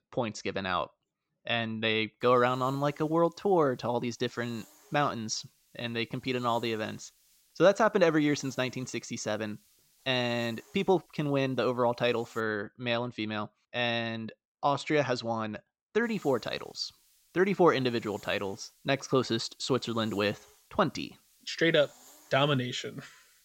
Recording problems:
high frequencies cut off; noticeable; nothing above 8 kHz
hiss; faint; from 2 to 12 s and from 16 s on; 30 dB below the speech

